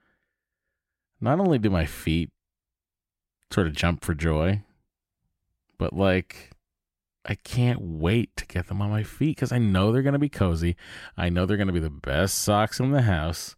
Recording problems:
none

